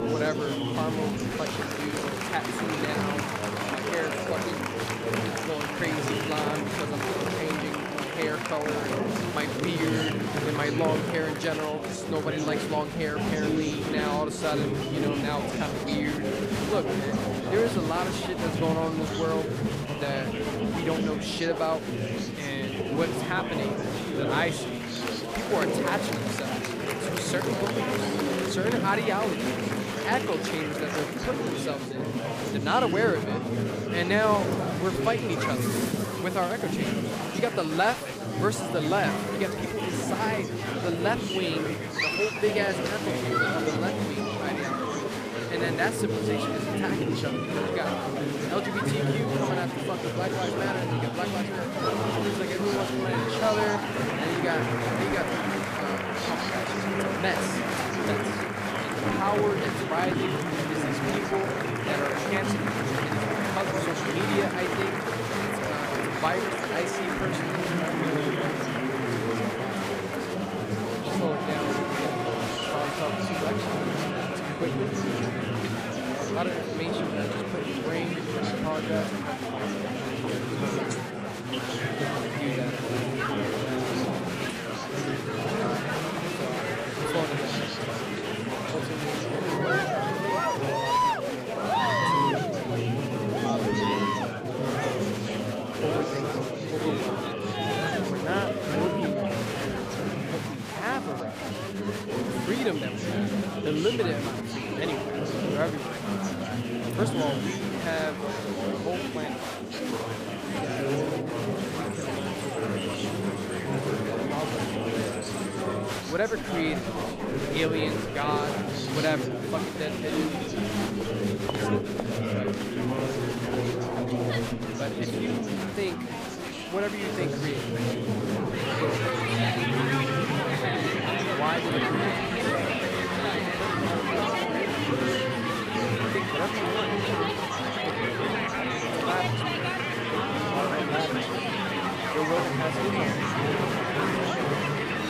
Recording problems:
chatter from many people; very loud; throughout; 4 dB above the speech

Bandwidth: 15 kHz